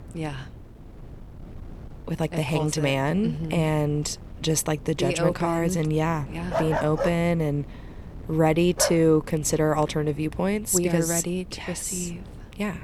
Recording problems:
wind noise on the microphone; occasional gusts; 25 dB below the speech
dog barking; noticeable; from 6.5 to 9 s; peak 3 dB below the speech

